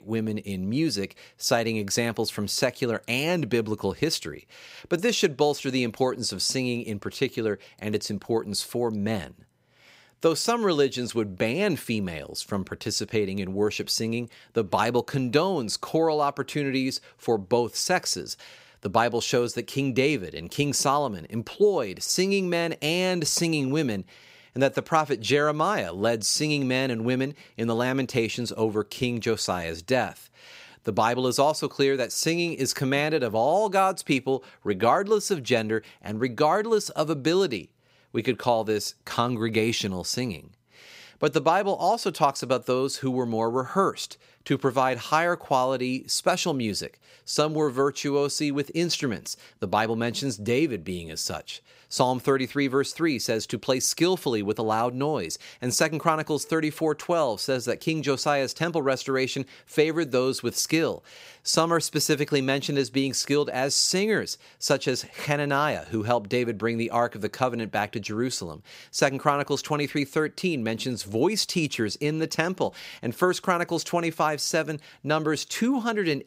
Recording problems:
none

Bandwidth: 15.5 kHz